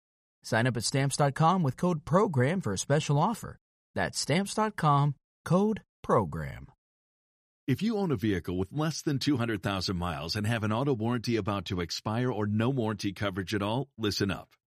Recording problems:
none

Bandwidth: 14.5 kHz